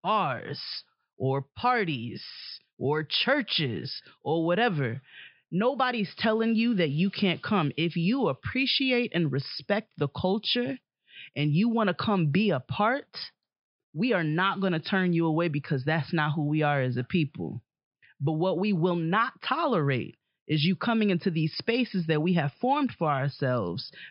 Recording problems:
high frequencies cut off; noticeable; nothing above 5.5 kHz

